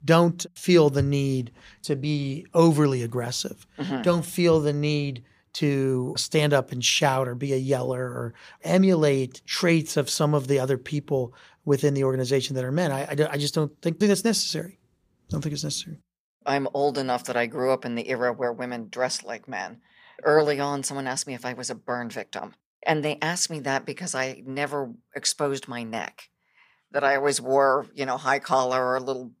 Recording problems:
none

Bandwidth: 15 kHz